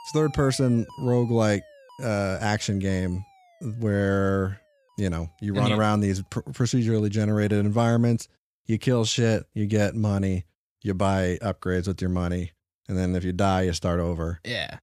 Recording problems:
alarms or sirens; faint; throughout; 25 dB below the speech

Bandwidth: 14.5 kHz